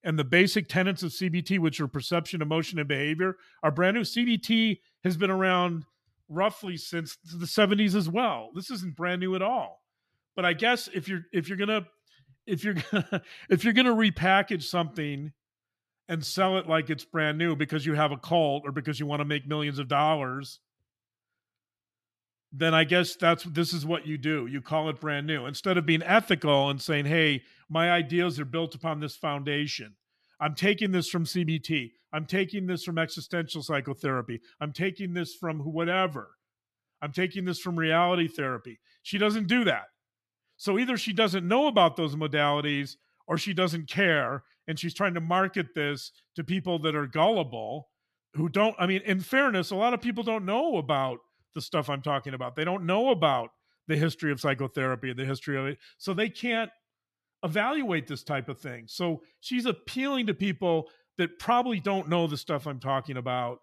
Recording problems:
none

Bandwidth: 14 kHz